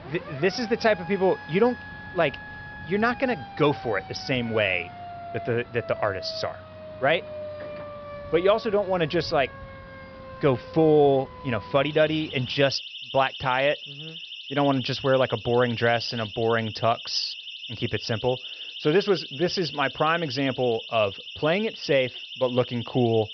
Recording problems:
high frequencies cut off; noticeable; nothing above 5.5 kHz
alarms or sirens; noticeable; throughout; 15 dB below the speech
traffic noise; faint; throughout; 20 dB below the speech

